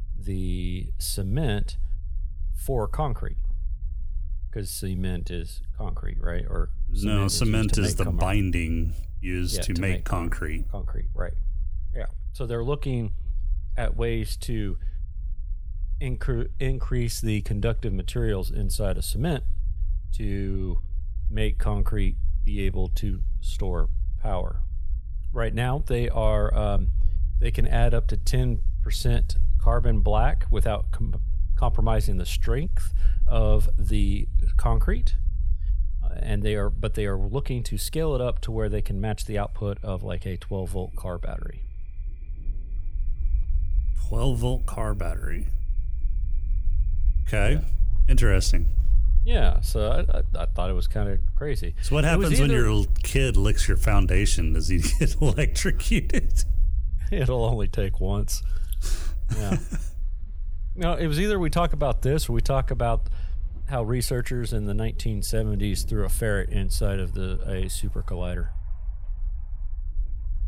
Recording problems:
rain or running water; faint; from 39 s on; 30 dB below the speech
low rumble; faint; throughout; 20 dB below the speech

